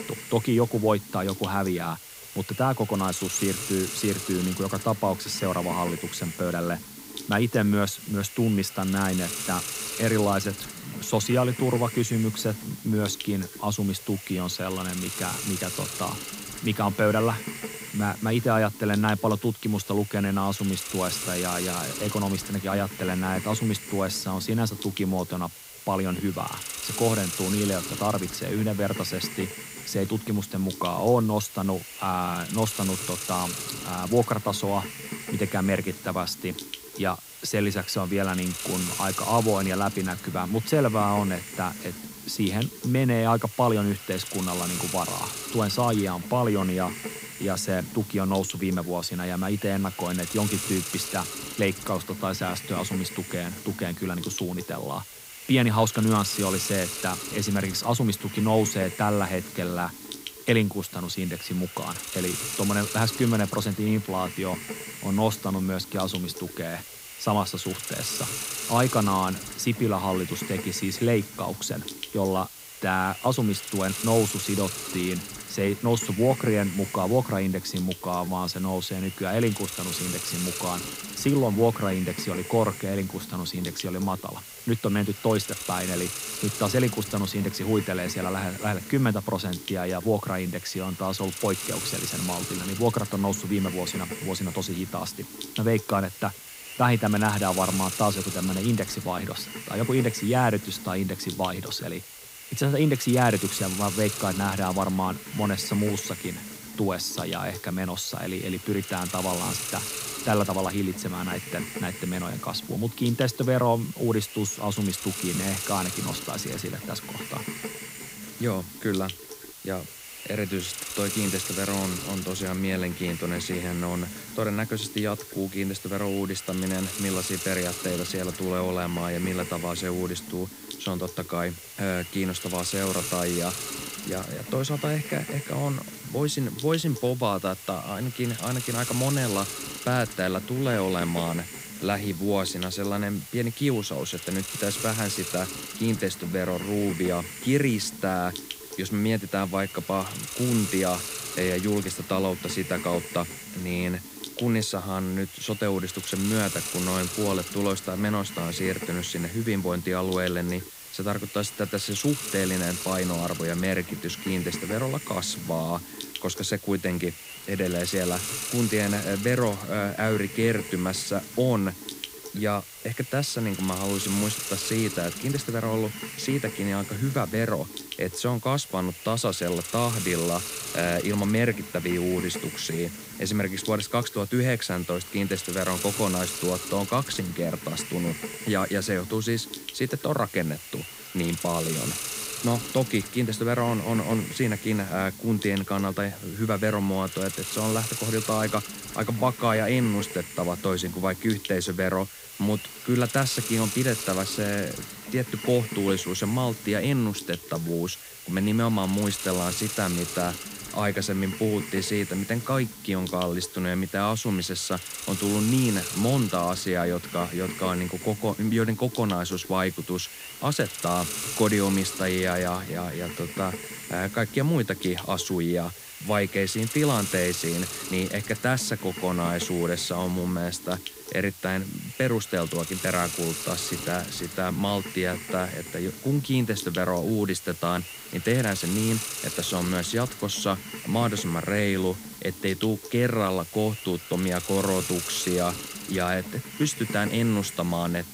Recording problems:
hiss; loud; throughout; 7 dB below the speech

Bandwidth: 15.5 kHz